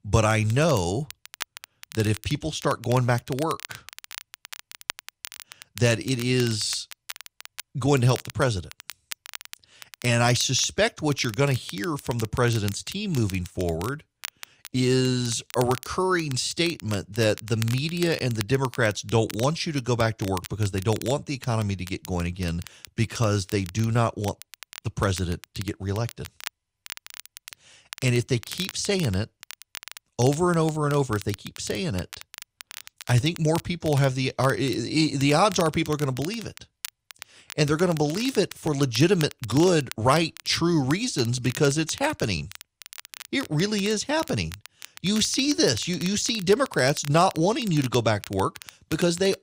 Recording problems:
crackle, like an old record; noticeable; 15 dB below the speech

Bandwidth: 15.5 kHz